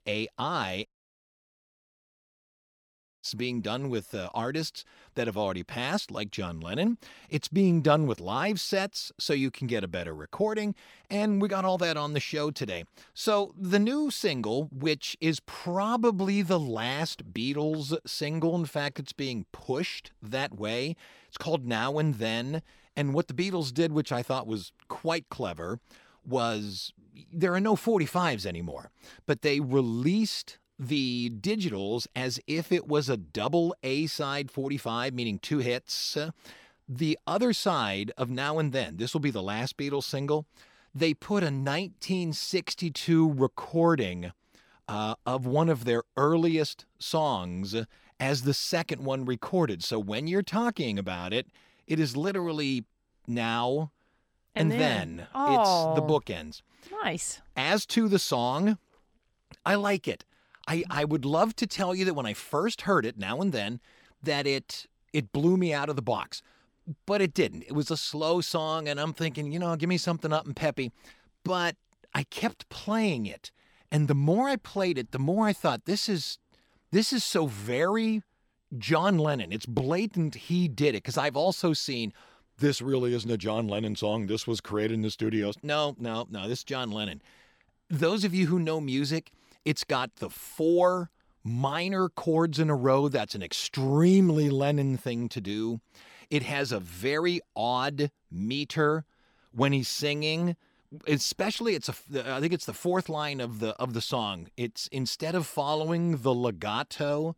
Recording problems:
audio cutting out; at 1 s for 2.5 s

